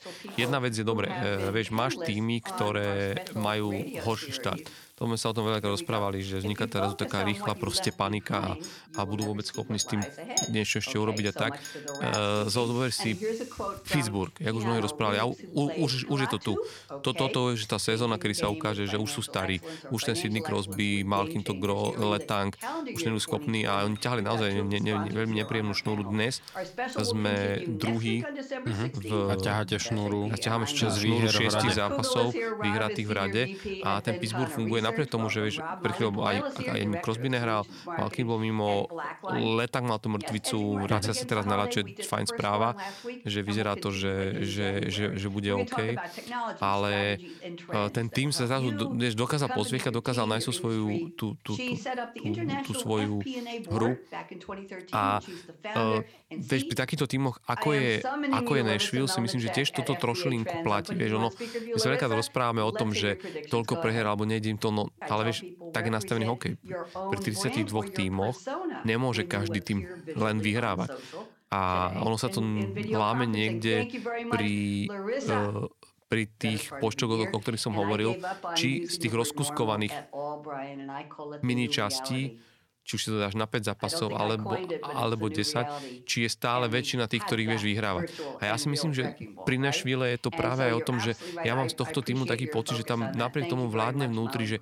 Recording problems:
voice in the background; loud; throughout; 8 dB below the speech
household noises; noticeable; until 27 s; 15 dB below the speech

